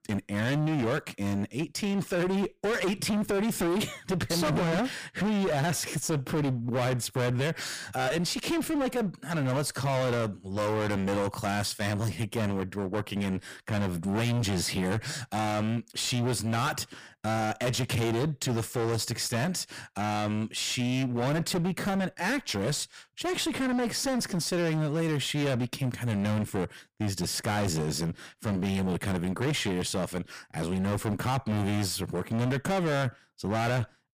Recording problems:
distortion; heavy; 29% of the sound clipped

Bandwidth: 15 kHz